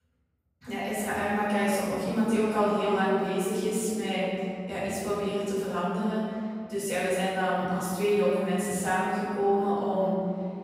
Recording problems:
room echo; strong; dies away in 2.6 s
off-mic speech; far

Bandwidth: 15.5 kHz